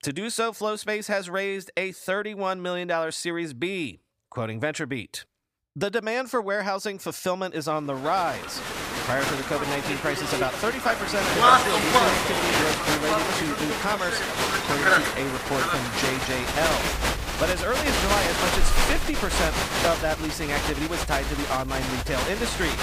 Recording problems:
crowd noise; very loud; from 8.5 s on; 4 dB above the speech

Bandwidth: 15 kHz